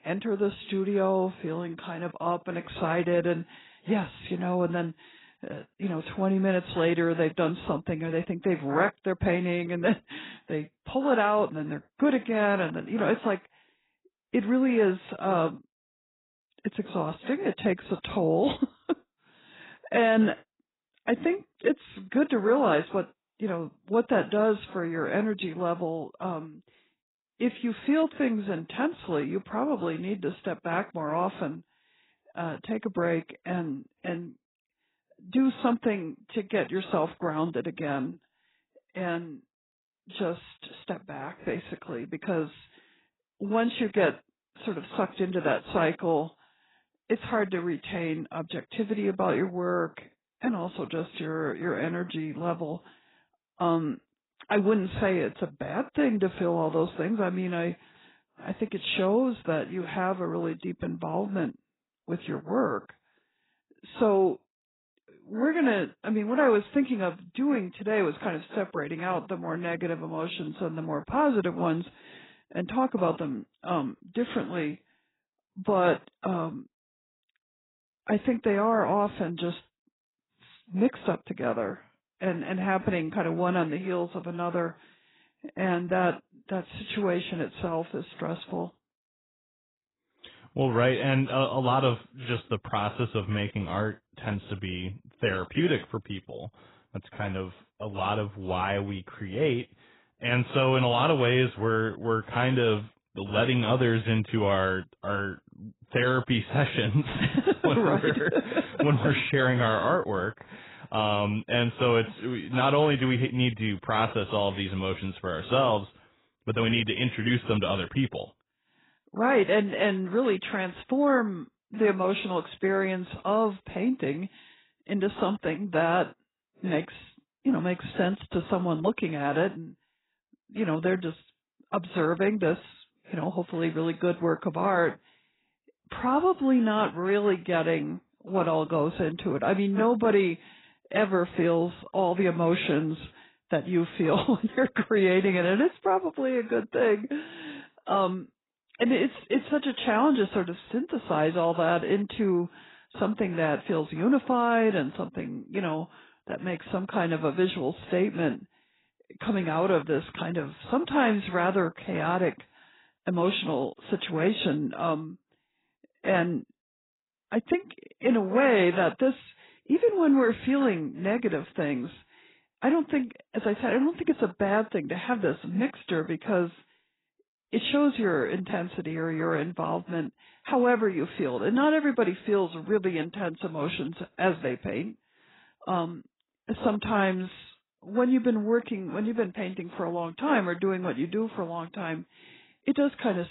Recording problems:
garbled, watery; badly; nothing above 4 kHz
abrupt cut into speech; at the end

